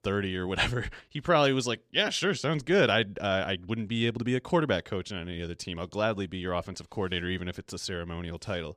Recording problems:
none

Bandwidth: 14.5 kHz